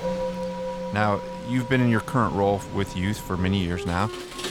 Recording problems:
background music; loud; throughout; 10 dB below the speech
rain or running water; noticeable; throughout; 15 dB below the speech

